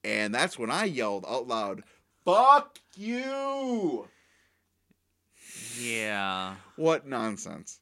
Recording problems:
none

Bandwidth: 16 kHz